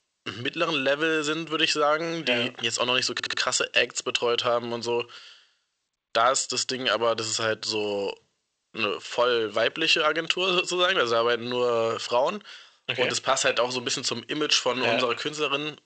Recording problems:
thin; somewhat; fading below 1 kHz
garbled, watery; slightly; nothing above 8 kHz
audio stuttering; at 3 s

